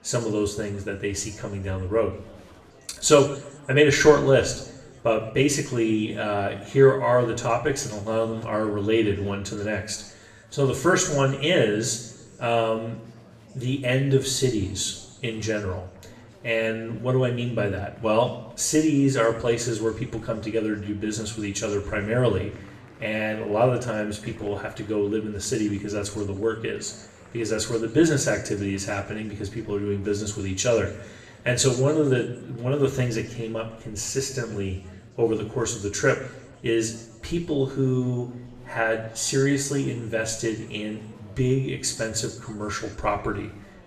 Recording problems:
room echo; slight; dies away in 0.7 s
off-mic speech; somewhat distant
chatter from many people; faint; throughout; 25 dB below the speech

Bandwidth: 14 kHz